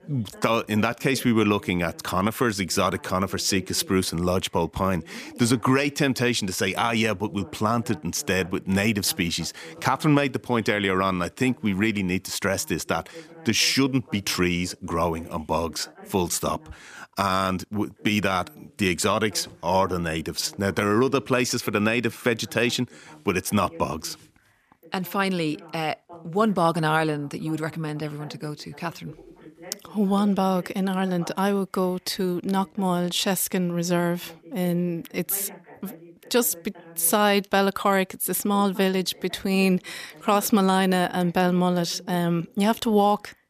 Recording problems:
voice in the background; faint; throughout; 25 dB below the speech

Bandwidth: 14.5 kHz